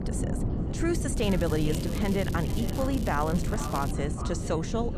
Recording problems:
echo of what is said; noticeable; throughout; 440 ms later, 15 dB below the speech
wind noise on the microphone; heavy; 8 dB below the speech
crackling; noticeable; from 1 to 4 s; 15 dB below the speech
background chatter; faint; throughout; 3 voices, 20 dB below the speech

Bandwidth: 14.5 kHz